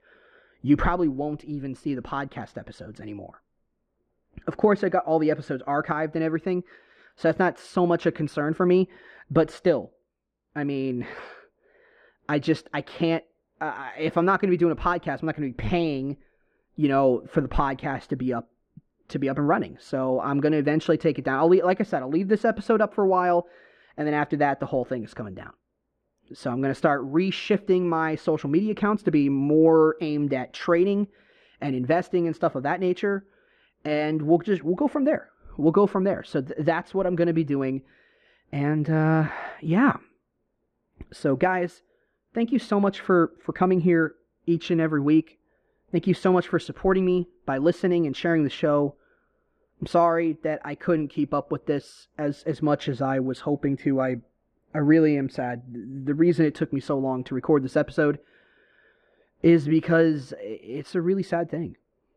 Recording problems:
muffled; very; fading above 1.5 kHz

